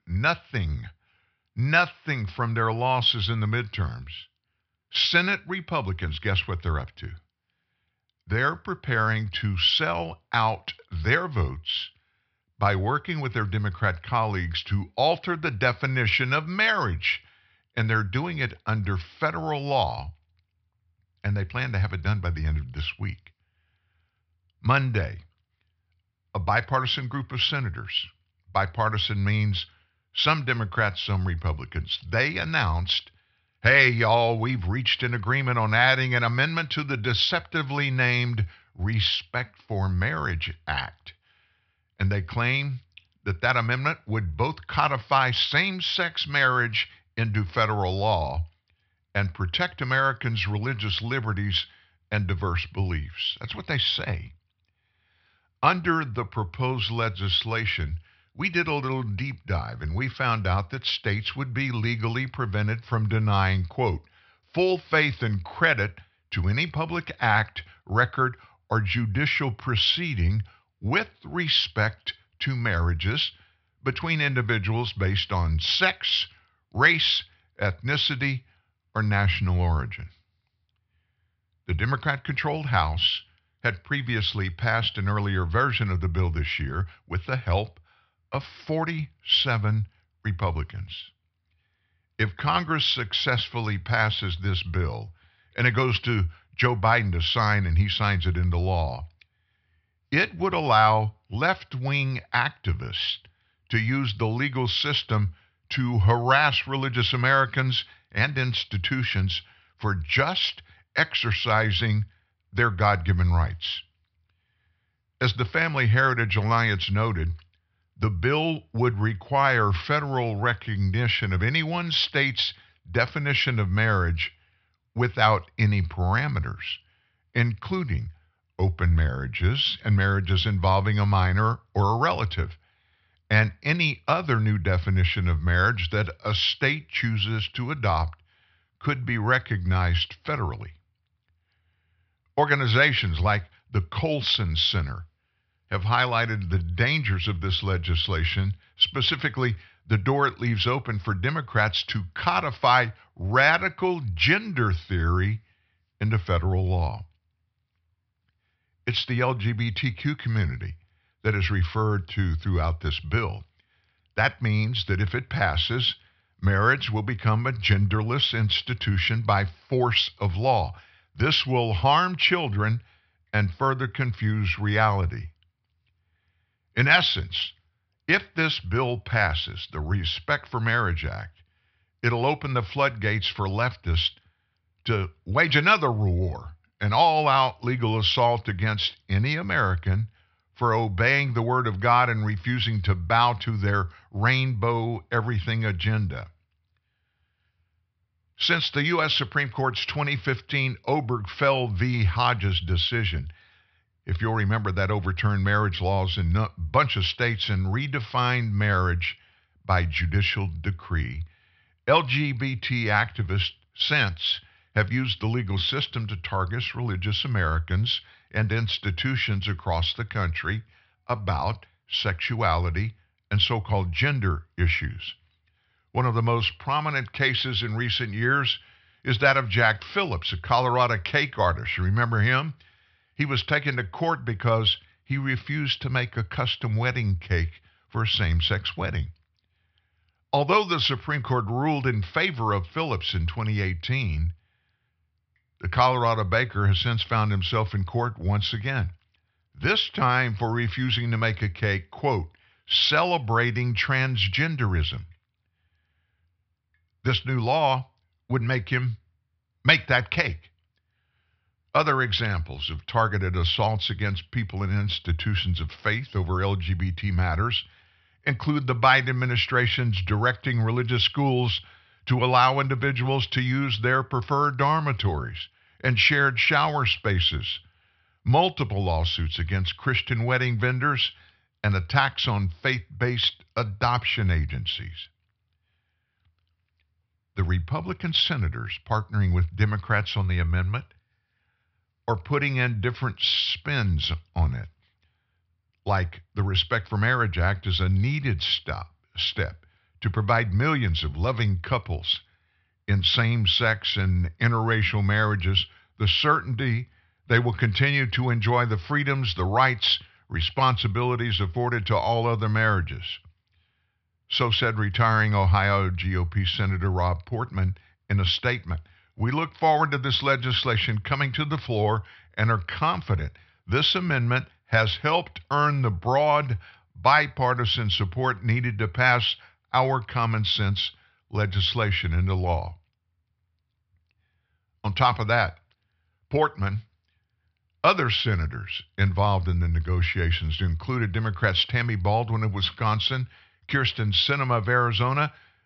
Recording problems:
high frequencies cut off; noticeable; nothing above 5.5 kHz

